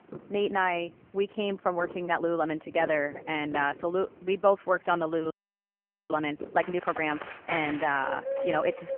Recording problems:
phone-call audio; poor line; nothing above 3 kHz
animal sounds; loud; throughout; 9 dB below the speech
audio freezing; at 5.5 s for 1 s

